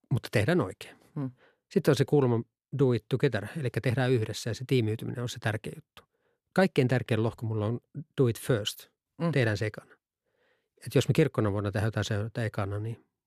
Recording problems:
none

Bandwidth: 14.5 kHz